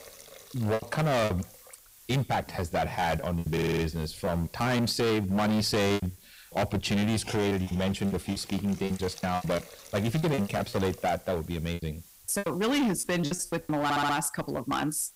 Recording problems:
distortion; heavy; 17% of the sound clipped
hiss; noticeable; throughout; 20 dB below the speech
choppy; very; 13% of the speech affected
audio stuttering; at 3.5 s and at 14 s

